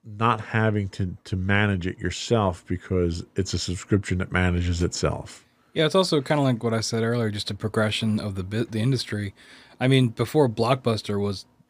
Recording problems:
none

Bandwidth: 15 kHz